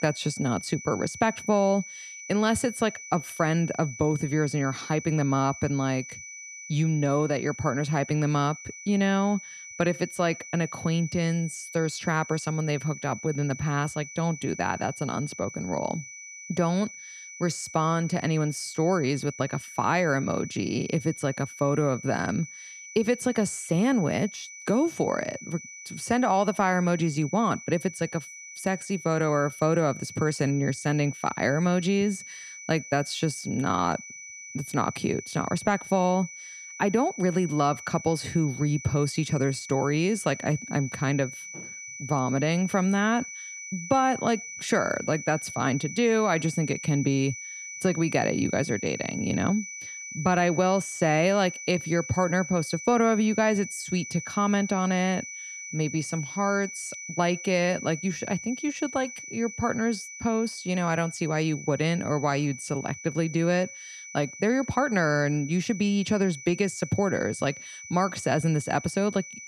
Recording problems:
high-pitched whine; noticeable; throughout; 2.5 kHz, 10 dB below the speech

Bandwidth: 14.5 kHz